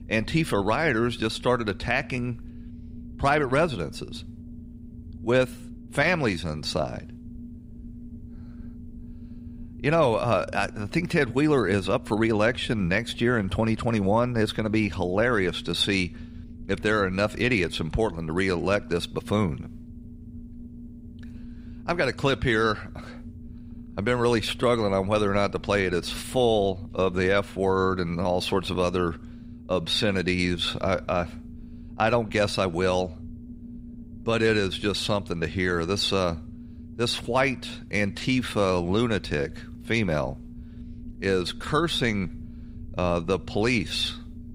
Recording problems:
low rumble; faint; throughout; 25 dB below the speech

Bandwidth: 15.5 kHz